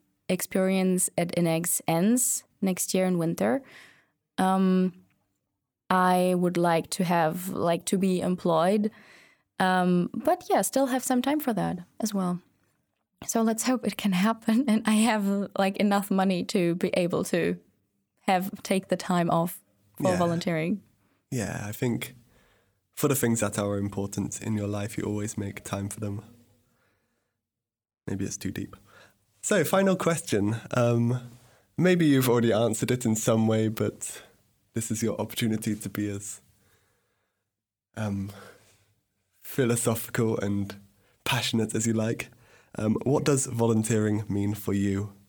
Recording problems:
none

